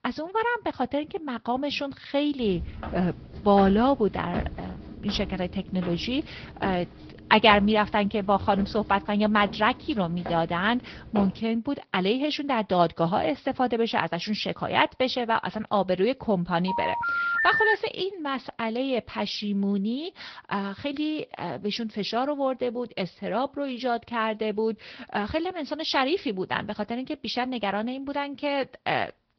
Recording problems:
high frequencies cut off; noticeable; nothing above 5.5 kHz
garbled, watery; slightly
footsteps; noticeable; from 2.5 to 11 s; peak 7 dB below the speech
phone ringing; loud; from 17 to 18 s; peak 5 dB above the speech

